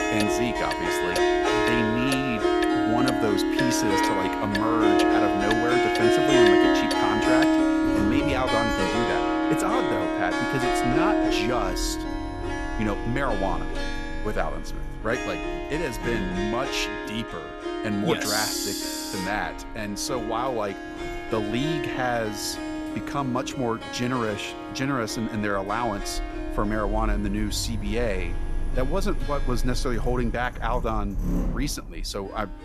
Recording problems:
background music; very loud; throughout; 3 dB above the speech
household noises; loud; throughout; 8 dB below the speech

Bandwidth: 13.5 kHz